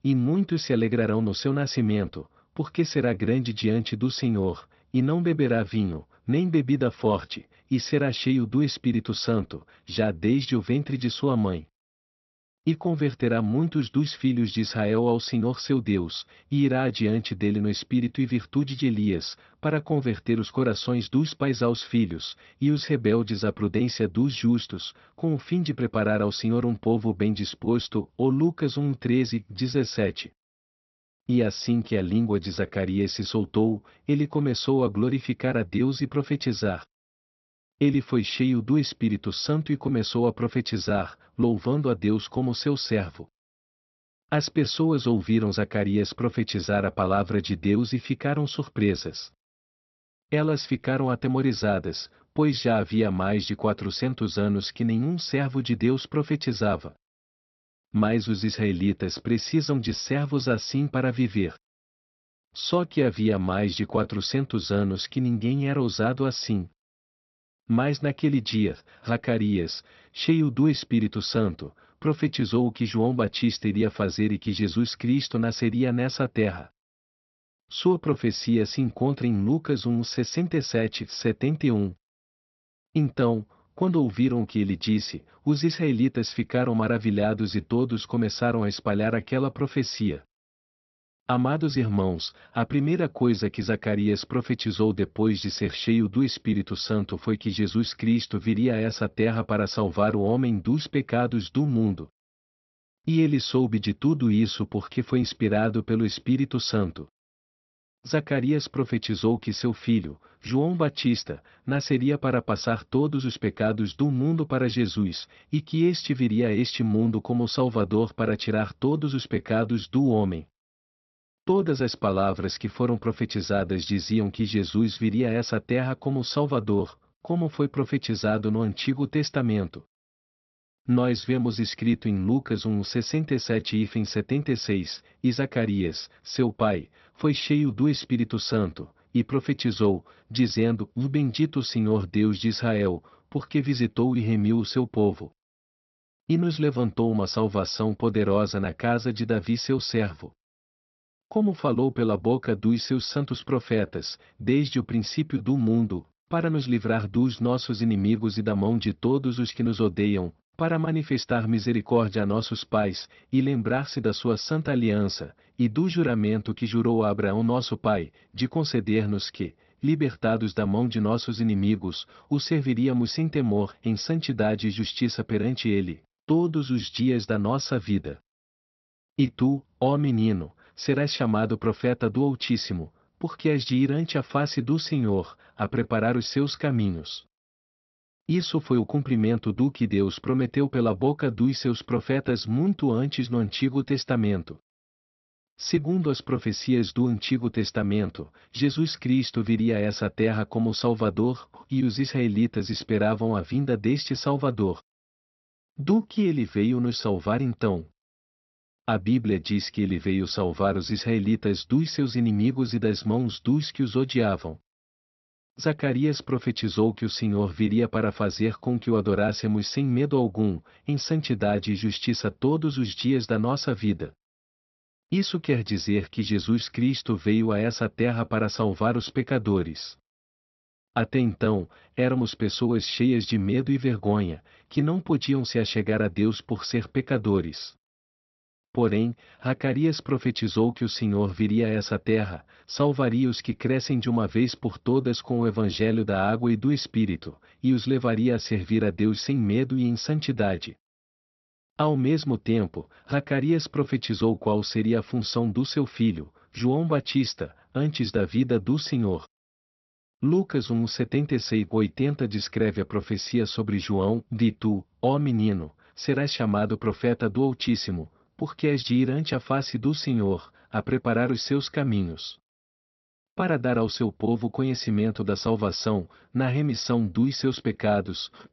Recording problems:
high frequencies cut off; noticeable; nothing above 5.5 kHz

